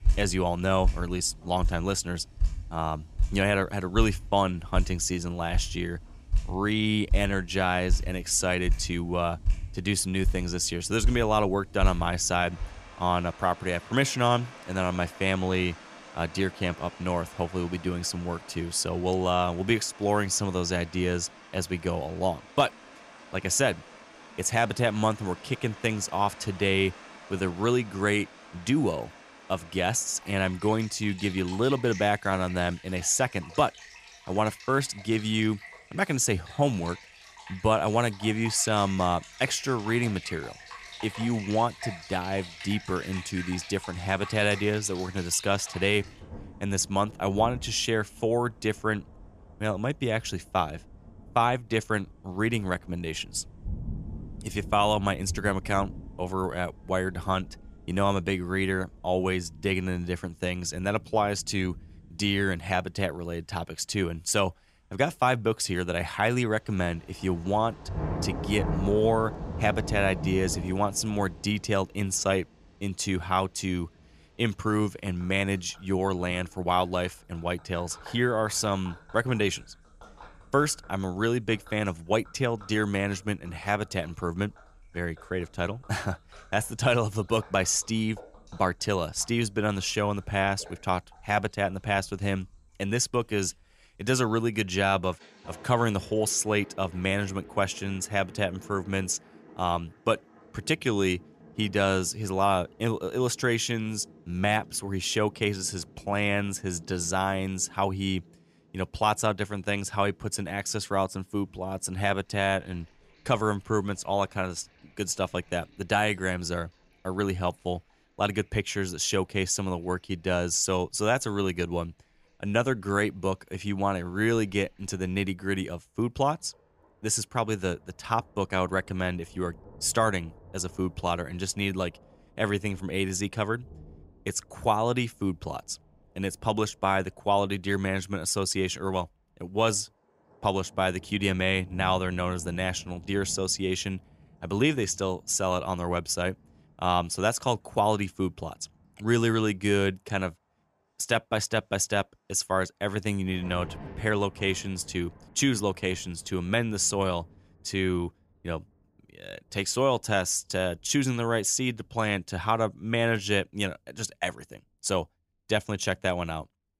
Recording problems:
rain or running water; noticeable; throughout; 15 dB below the speech

